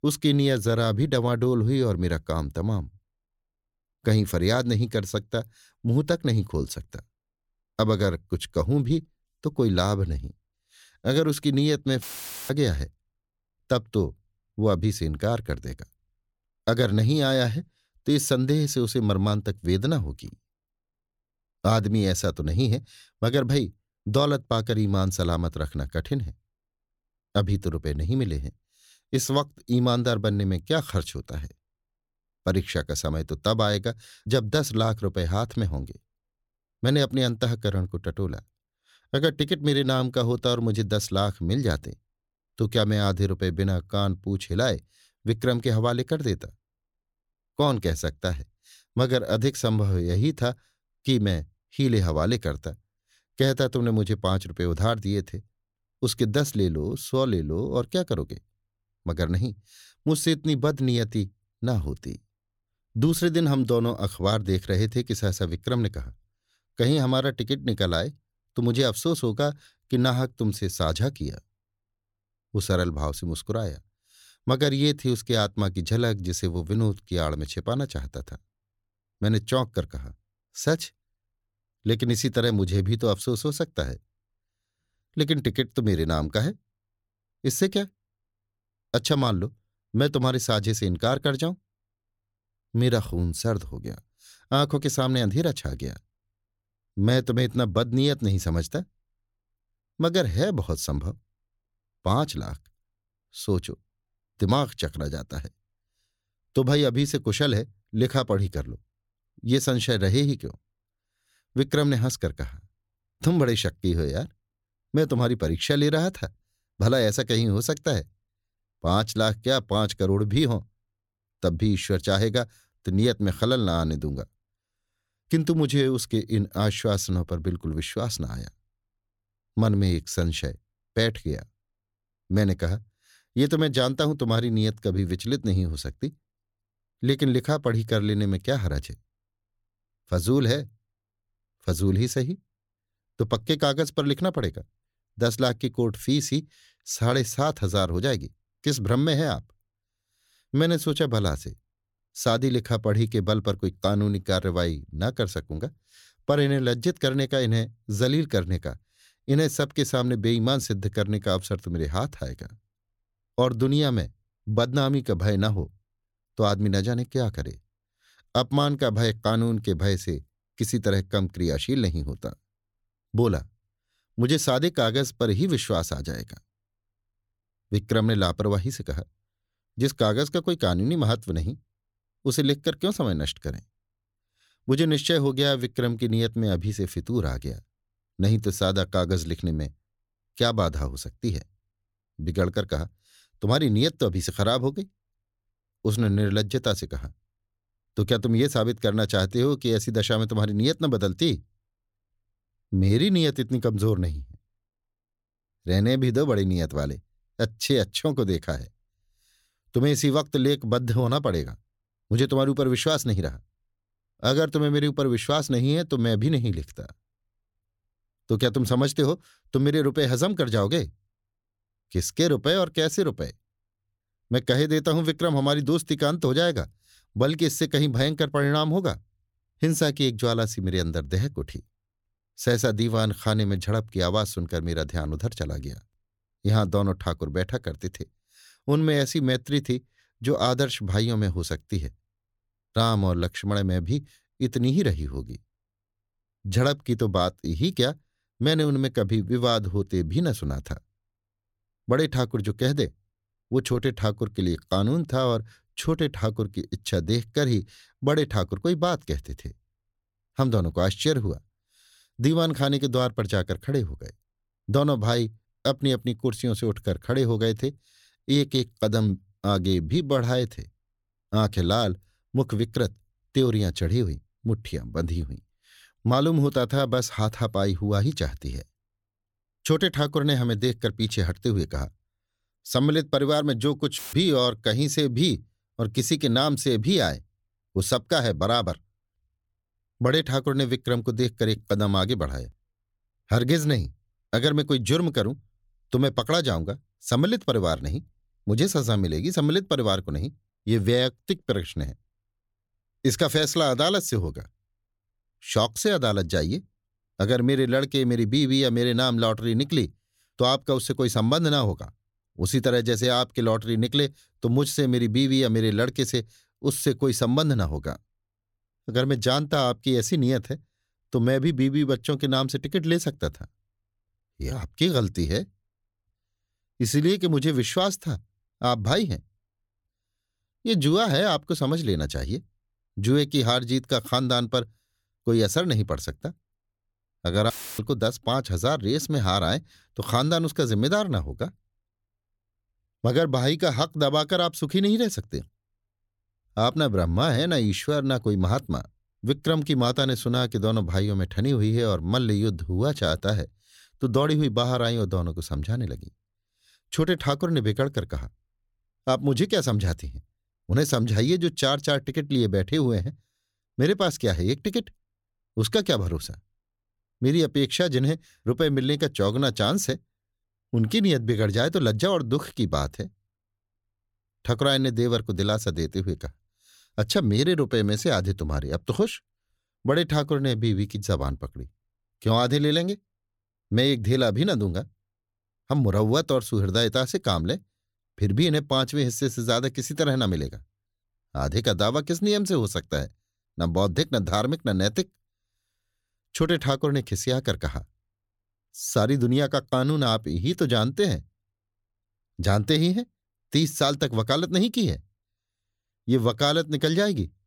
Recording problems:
audio cutting out; filled with static; at 12 s, at 4:44 and at 5:38

